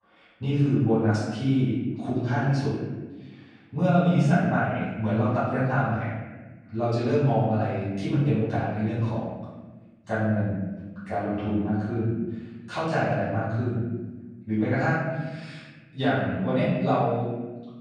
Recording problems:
room echo; strong; dies away in 1.4 s
off-mic speech; far

